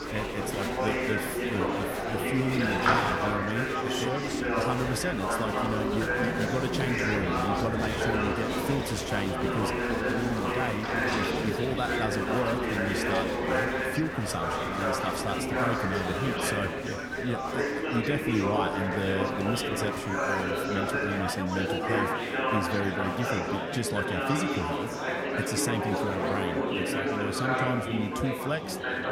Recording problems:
murmuring crowd; very loud; throughout; 4 dB above the speech

